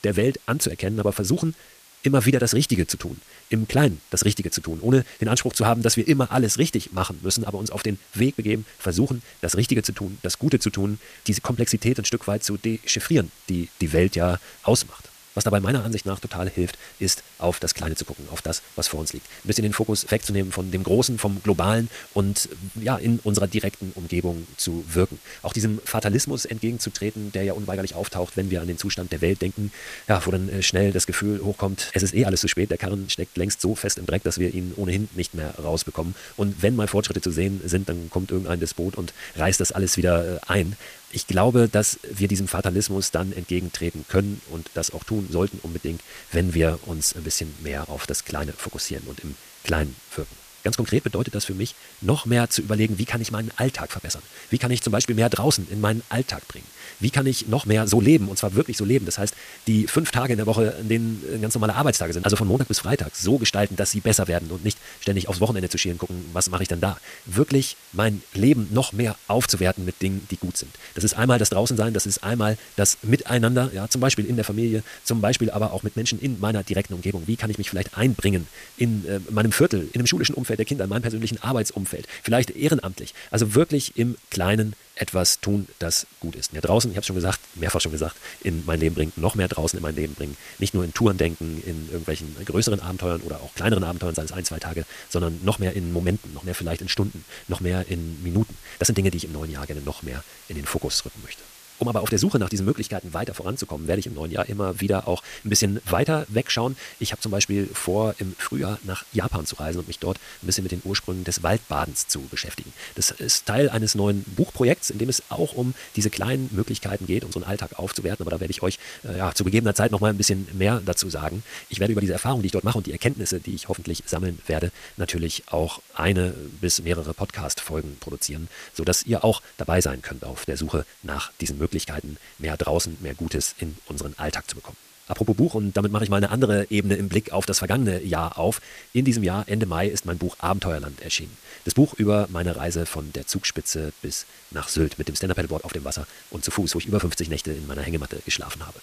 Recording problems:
wrong speed, natural pitch; too fast; 1.6 times normal speed
hiss; faint; throughout; 20 dB below the speech

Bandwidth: 14.5 kHz